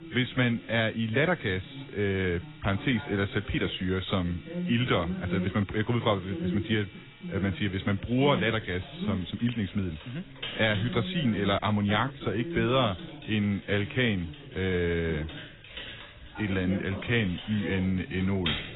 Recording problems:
garbled, watery; badly; nothing above 4 kHz
household noises; noticeable; throughout; 15 dB below the speech
voice in the background; noticeable; throughout; 10 dB below the speech

